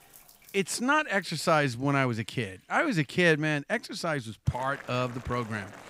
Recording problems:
household noises; faint; throughout; 20 dB below the speech

